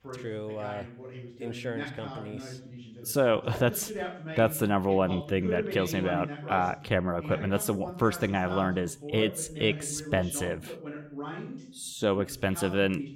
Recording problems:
voice in the background; noticeable; throughout; 10 dB below the speech

